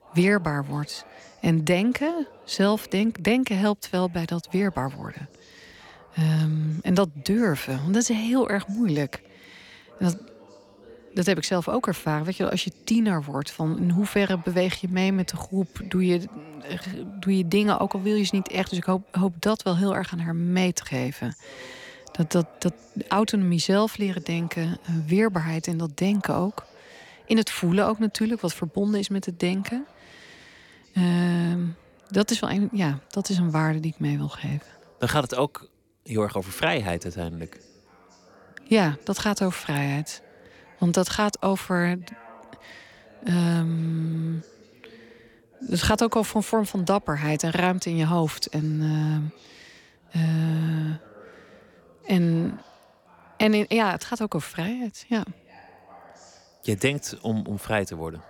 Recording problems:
voice in the background; faint; throughout; 25 dB below the speech

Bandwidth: 17.5 kHz